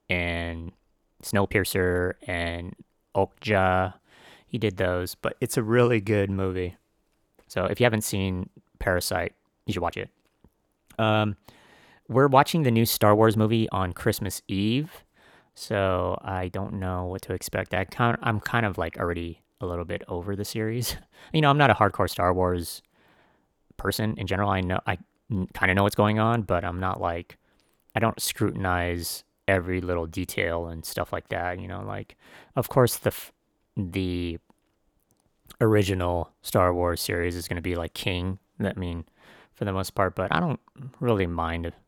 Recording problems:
uneven, jittery; strongly; from 1 to 41 s

